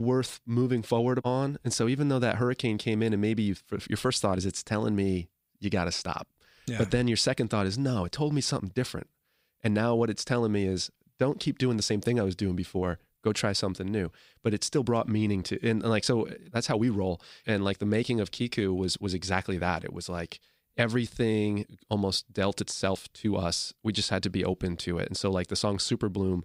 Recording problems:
abrupt cut into speech; at the start

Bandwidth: 15.5 kHz